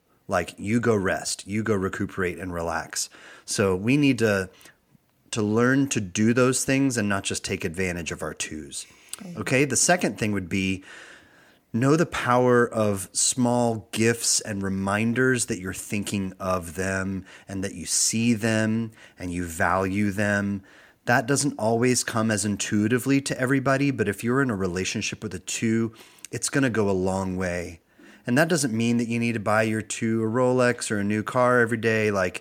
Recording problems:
none

